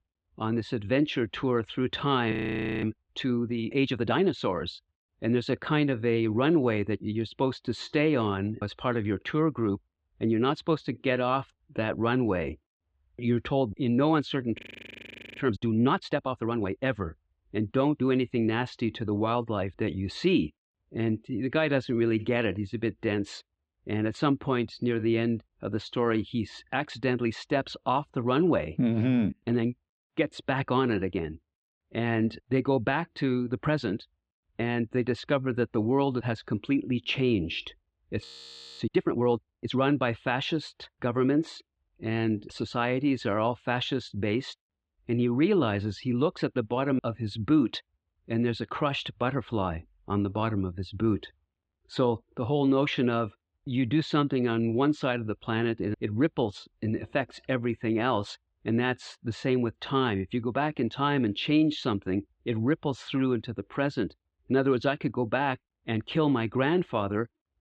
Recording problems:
muffled; slightly; fading above 3.5 kHz
audio freezing; at 2.5 s for 0.5 s, at 15 s for 1 s and at 38 s for 0.5 s

